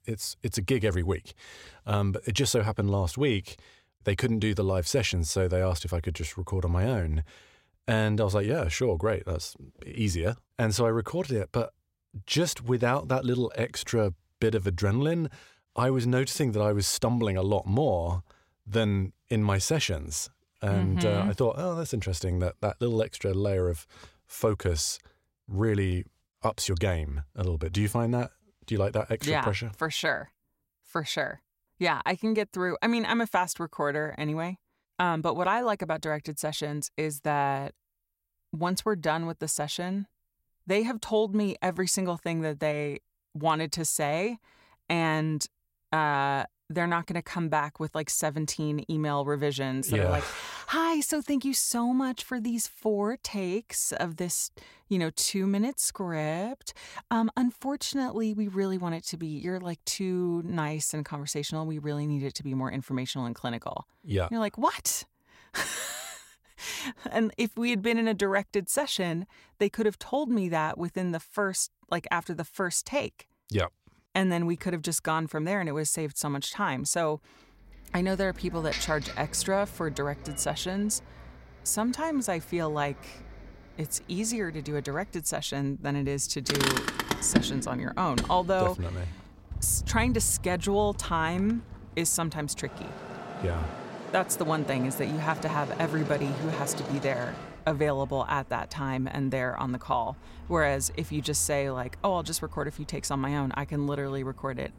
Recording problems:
traffic noise; loud; from 1:18 on; 9 dB below the speech

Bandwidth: 16 kHz